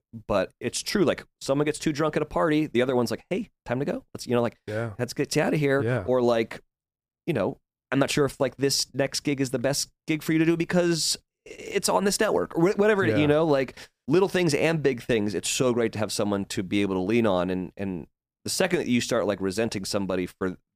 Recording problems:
none

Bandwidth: 15 kHz